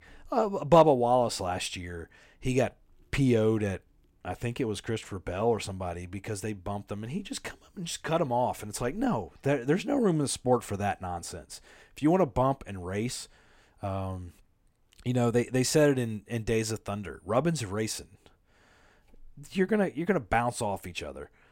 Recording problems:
none

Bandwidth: 16 kHz